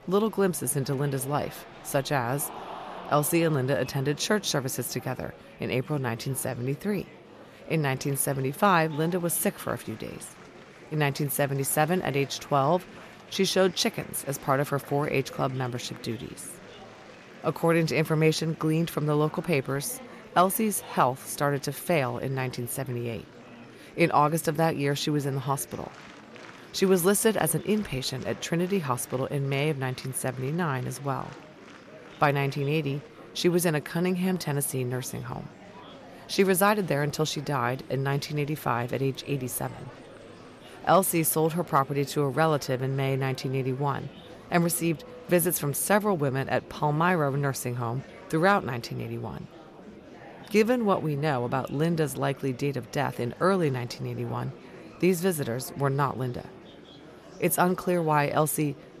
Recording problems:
murmuring crowd; noticeable; throughout; 20 dB below the speech

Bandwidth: 14.5 kHz